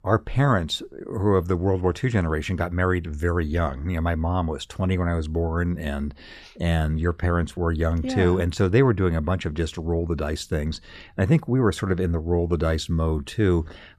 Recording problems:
none

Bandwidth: 14 kHz